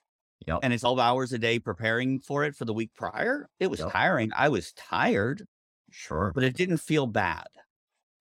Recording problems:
none

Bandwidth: 16.5 kHz